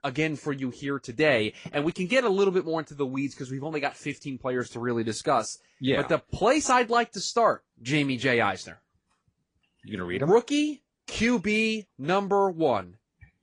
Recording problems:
garbled, watery; slightly; nothing above 8 kHz

